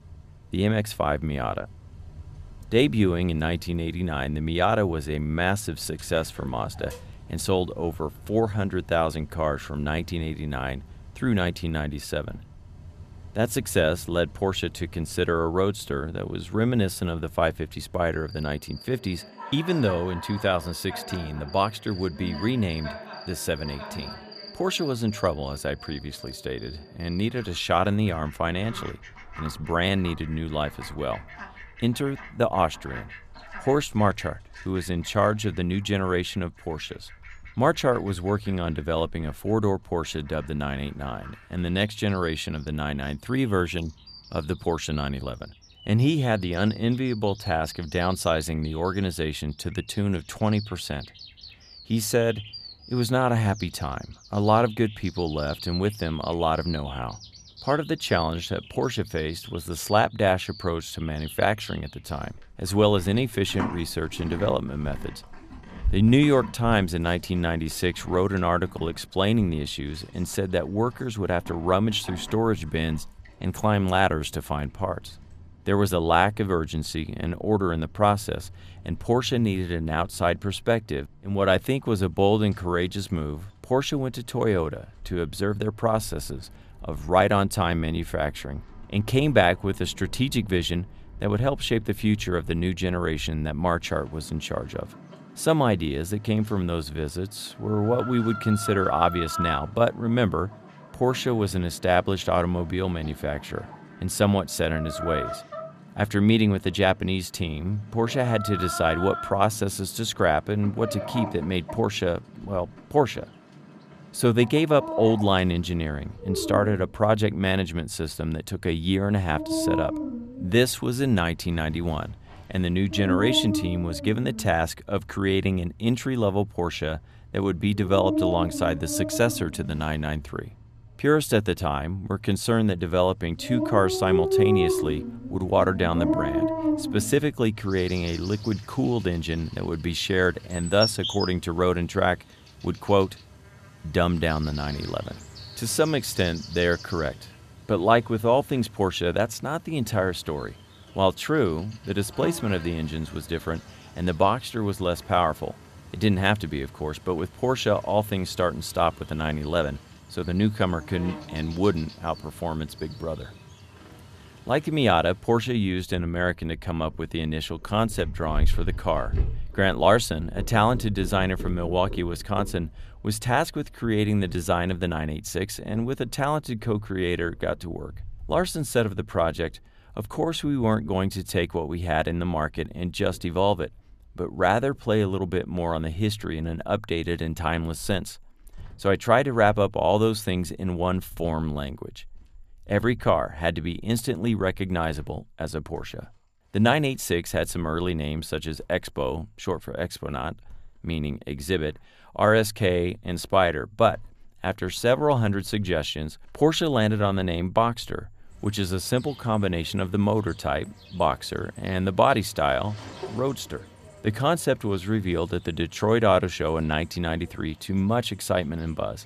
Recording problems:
animal sounds; noticeable; throughout; 10 dB below the speech

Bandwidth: 14.5 kHz